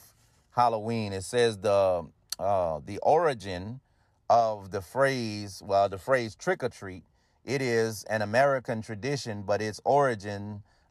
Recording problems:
none

